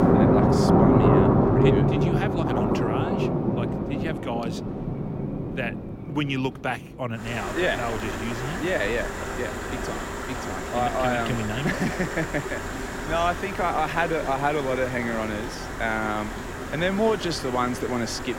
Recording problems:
rain or running water; very loud; throughout; 2 dB above the speech

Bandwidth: 16.5 kHz